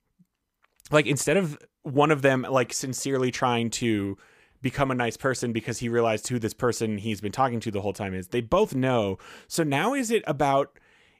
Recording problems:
none

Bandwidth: 15 kHz